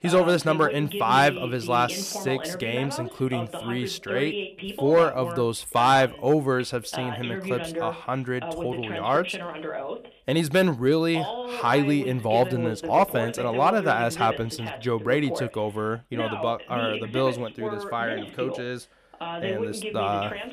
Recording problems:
voice in the background; loud; throughout; 8 dB below the speech

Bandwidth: 14.5 kHz